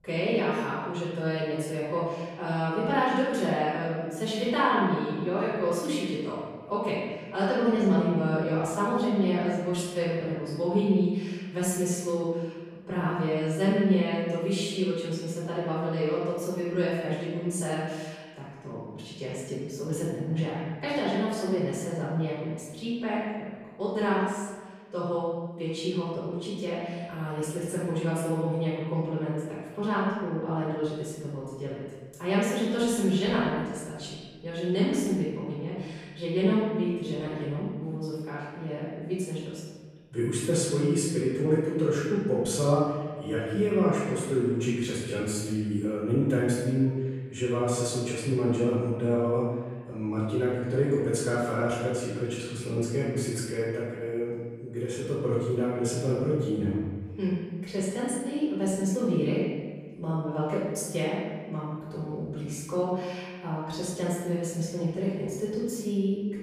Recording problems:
room echo; strong; dies away in 1.4 s
off-mic speech; far

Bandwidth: 15 kHz